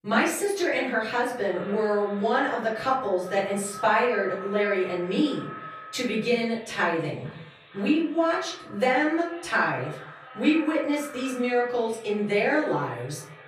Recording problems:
off-mic speech; far
echo of what is said; noticeable; throughout; 460 ms later, 20 dB below the speech
room echo; noticeable; dies away in 0.6 s

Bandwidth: 14 kHz